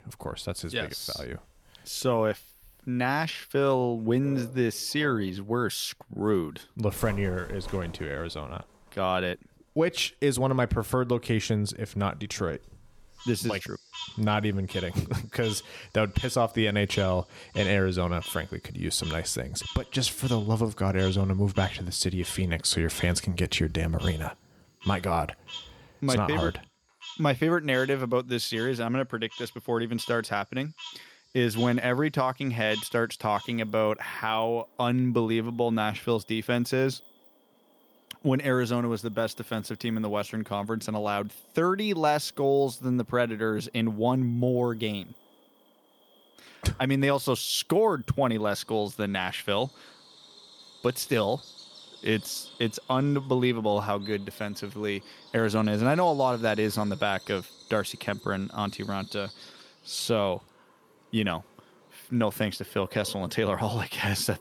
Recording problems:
animal sounds; noticeable; throughout; 15 dB below the speech

